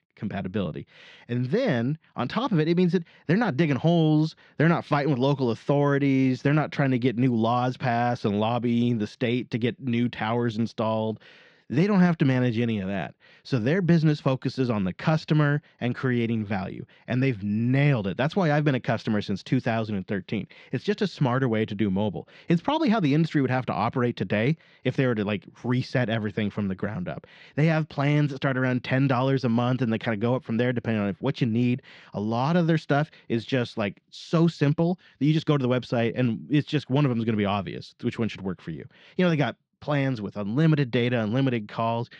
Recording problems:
muffled; slightly; fading above 4 kHz

